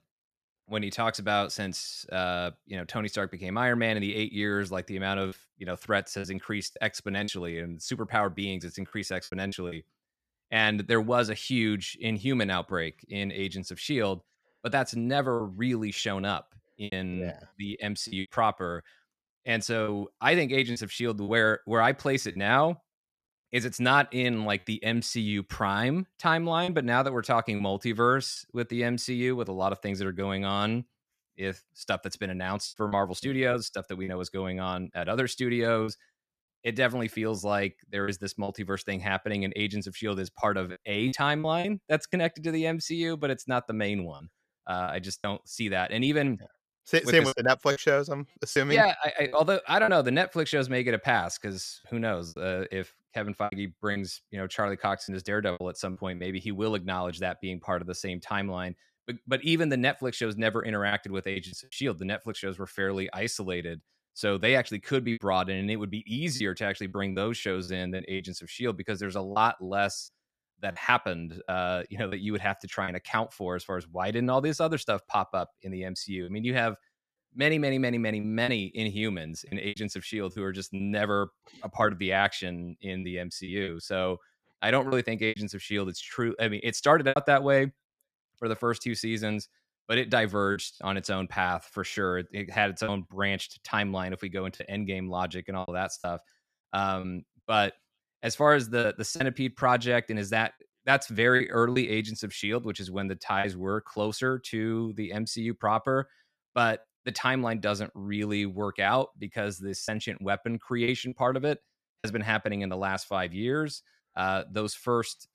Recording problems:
choppy; occasionally; 4% of the speech affected

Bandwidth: 14.5 kHz